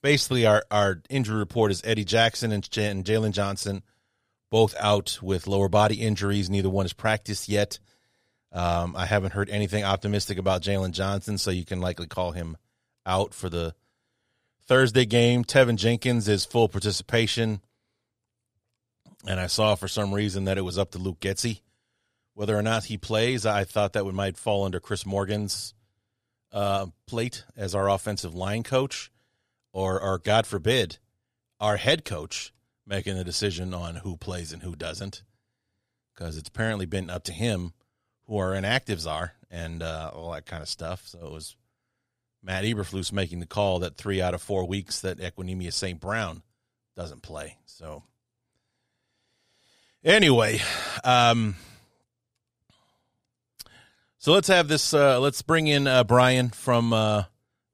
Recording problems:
none

